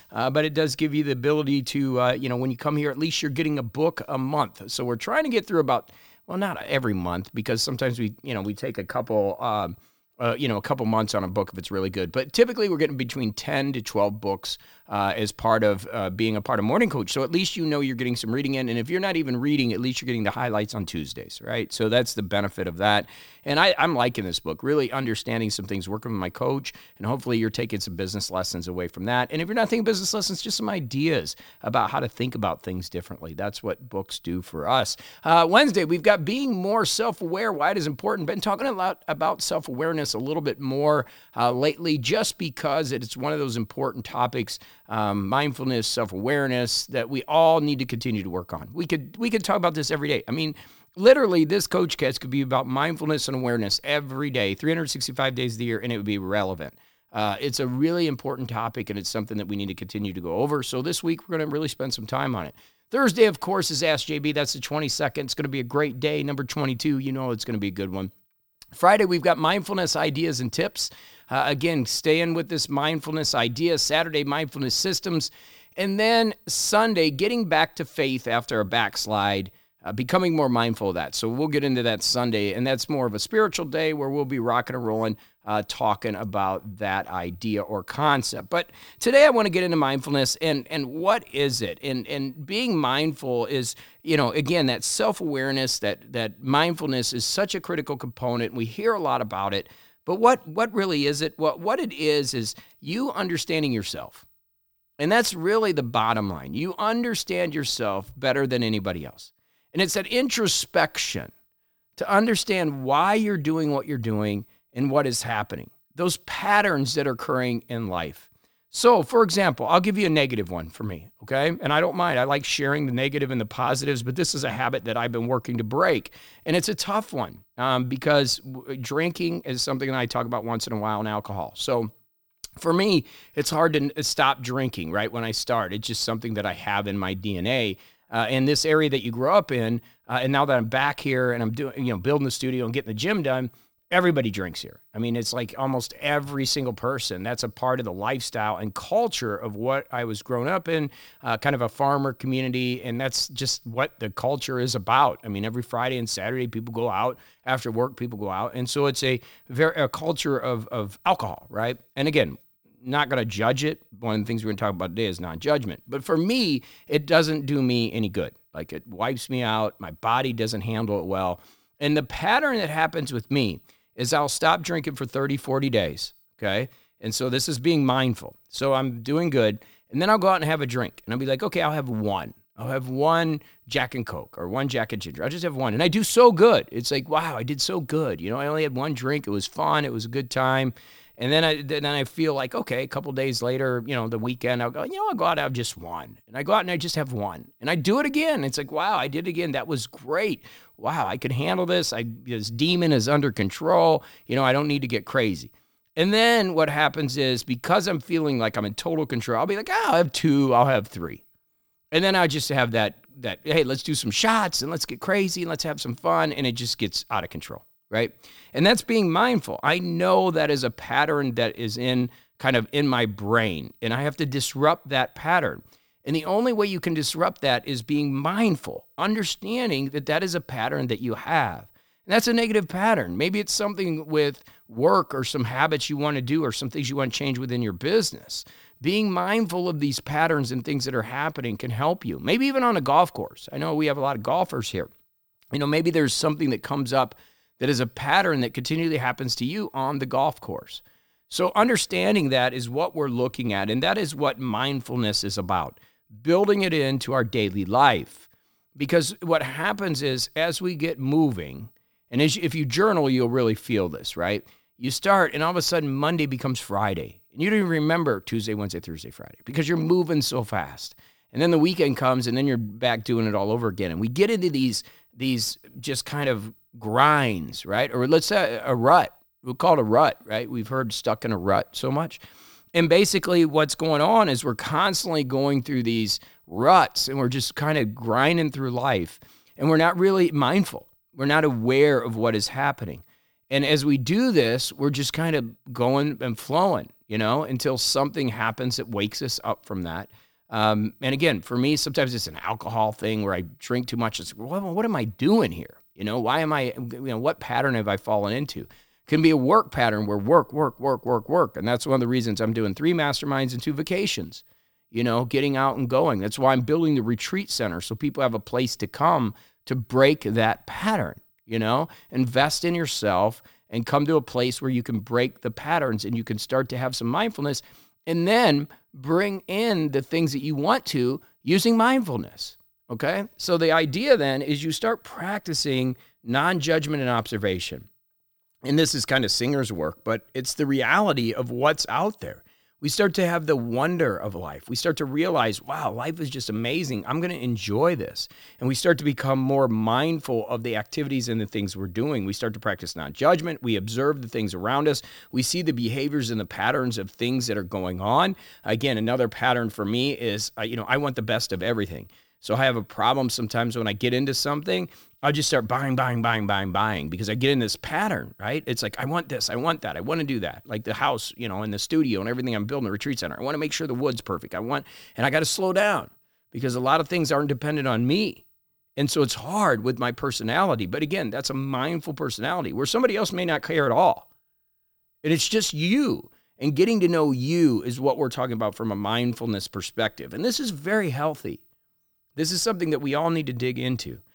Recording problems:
none

